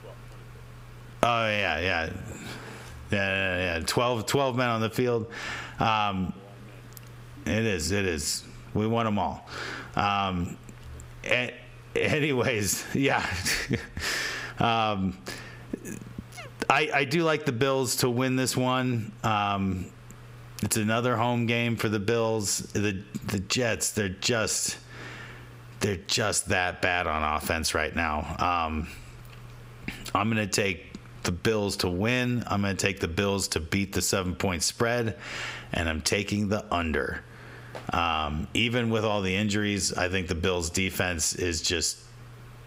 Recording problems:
squashed, flat; heavily

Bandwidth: 15.5 kHz